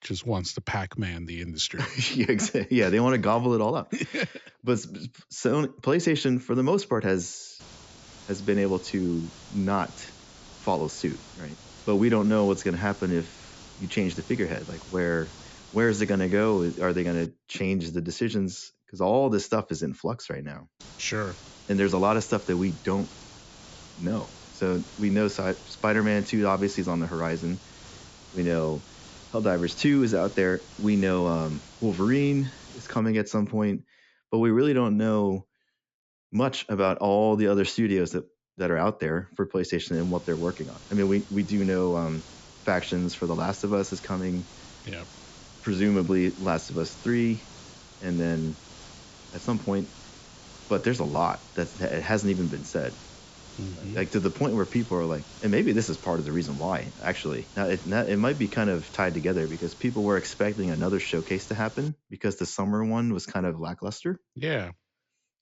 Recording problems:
high frequencies cut off; noticeable; nothing above 8 kHz
hiss; noticeable; from 7.5 to 17 s, from 21 to 33 s and from 40 s to 1:02; 20 dB below the speech

